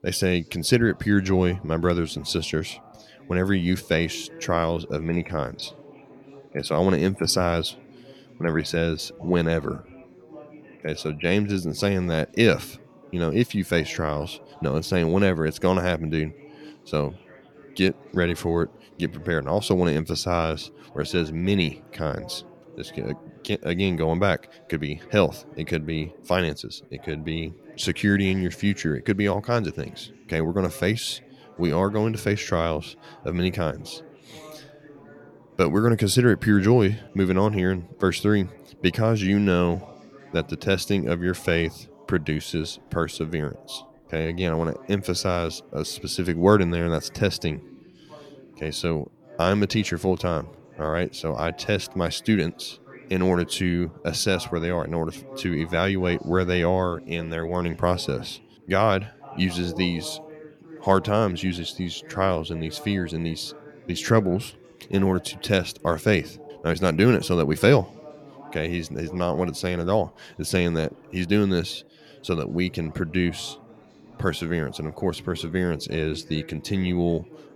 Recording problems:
background chatter; faint; throughout; 3 voices, 20 dB below the speech

